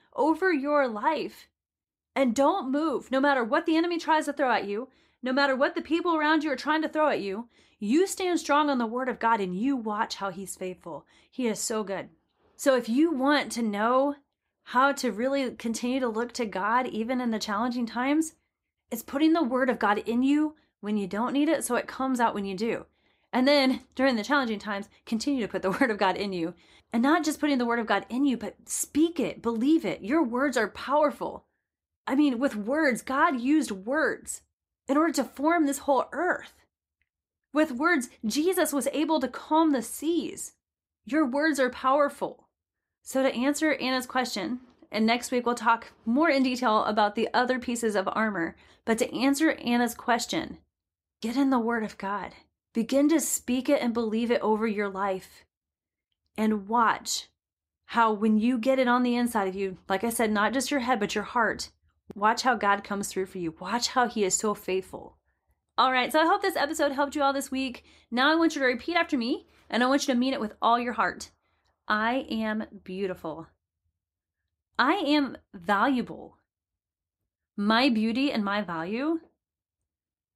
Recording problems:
none

